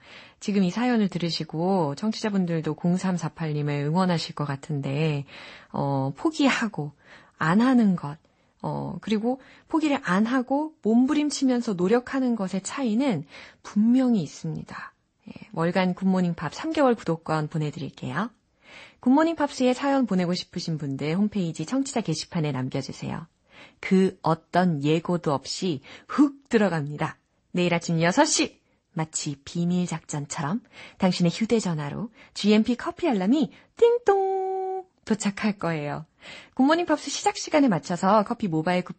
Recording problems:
garbled, watery; slightly; nothing above 8 kHz

